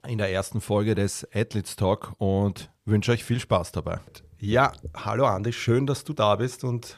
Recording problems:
none

